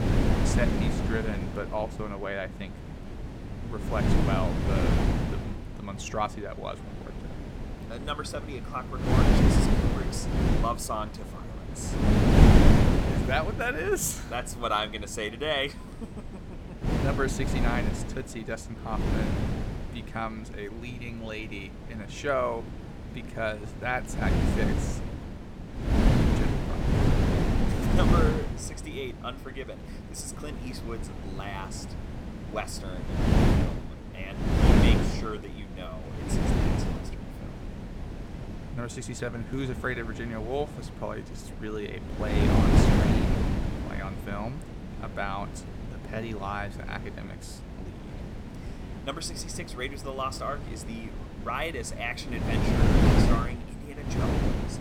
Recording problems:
wind noise on the microphone; heavy; 1 dB above the speech
background chatter; faint; throughout; 2 voices, 30 dB below the speech

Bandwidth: 17 kHz